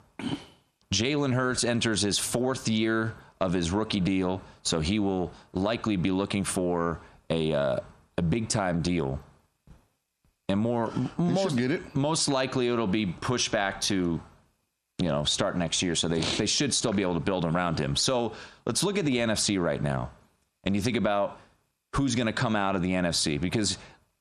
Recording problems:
squashed, flat; heavily

